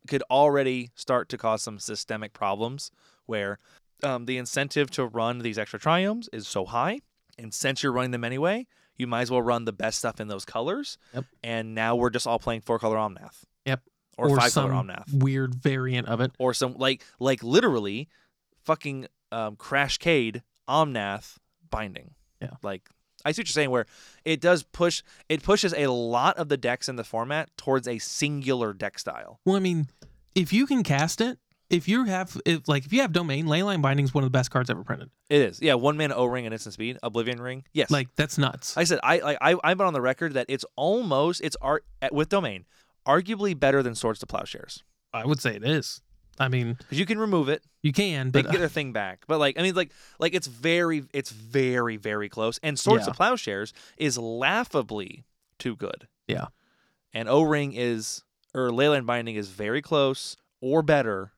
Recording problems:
none

